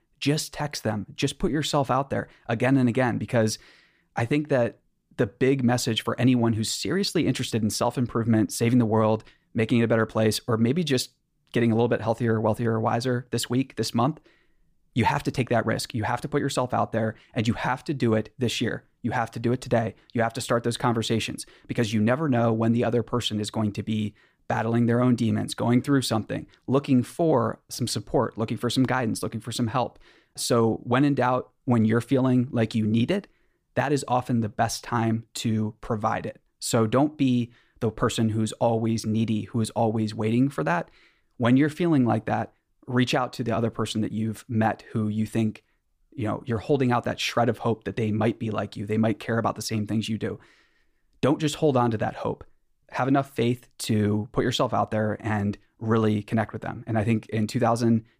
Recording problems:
none

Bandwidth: 15 kHz